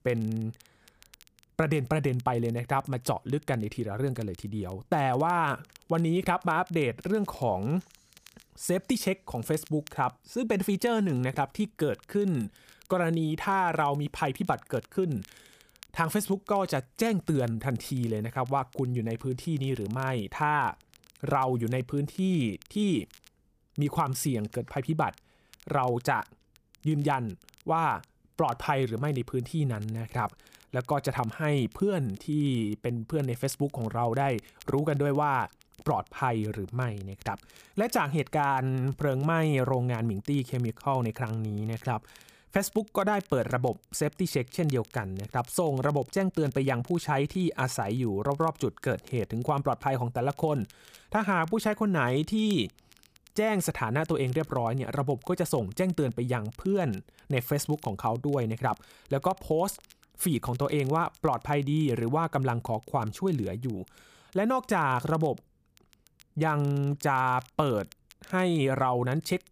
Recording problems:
crackle, like an old record; faint; 30 dB below the speech

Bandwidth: 15 kHz